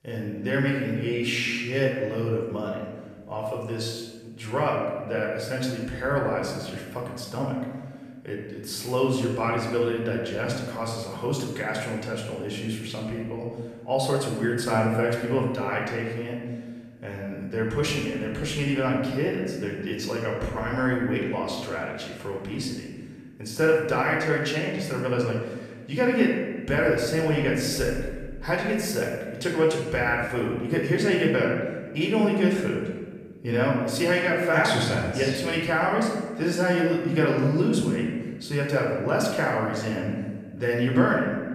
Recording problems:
off-mic speech; far
room echo; noticeable; dies away in 1.3 s

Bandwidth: 15 kHz